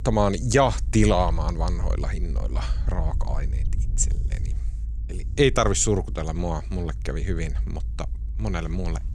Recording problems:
low rumble; faint; throughout; 25 dB below the speech

